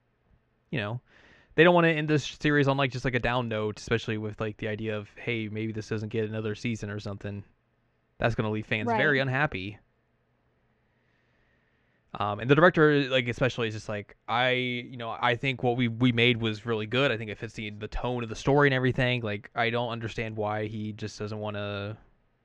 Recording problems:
muffled; slightly; fading above 3 kHz

